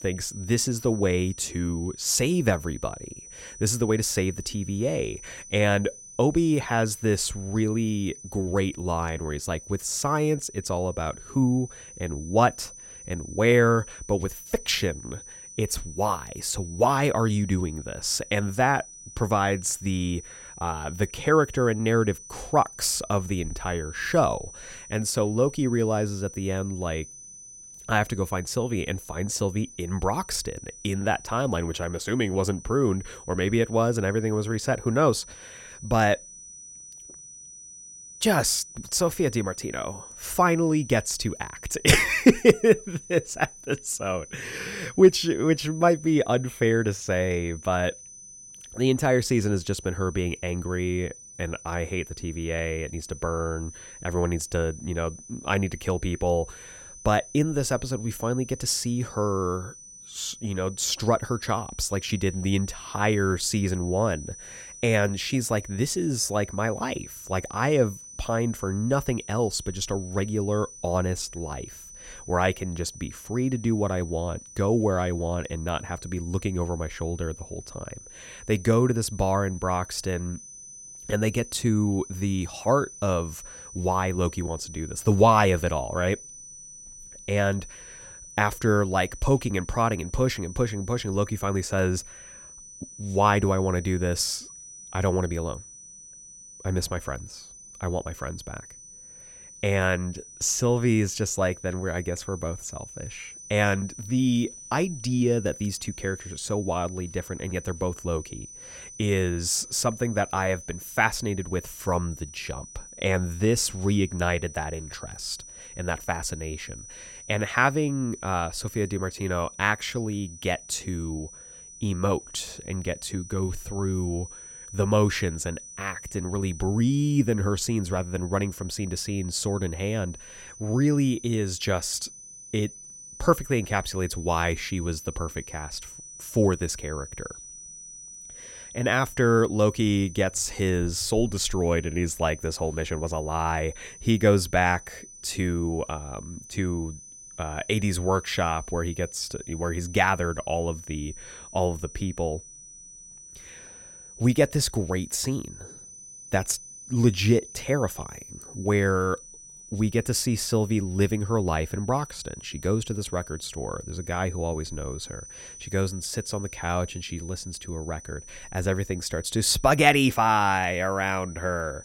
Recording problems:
high-pitched whine; noticeable; throughout; 6 kHz, 15 dB below the speech

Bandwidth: 16 kHz